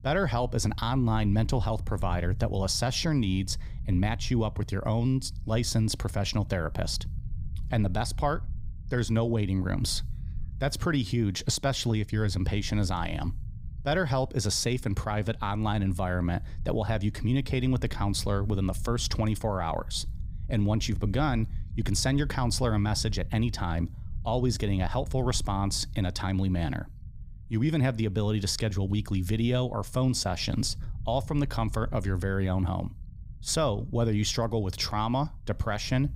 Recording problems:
low rumble; faint; throughout; 25 dB below the speech

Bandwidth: 15.5 kHz